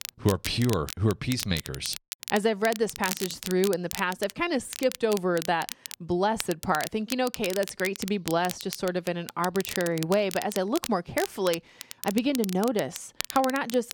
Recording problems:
crackle, like an old record; loud; 10 dB below the speech

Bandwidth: 17.5 kHz